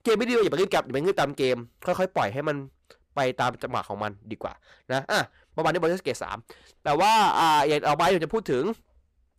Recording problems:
distortion; heavy; 9% of the sound clipped

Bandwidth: 15 kHz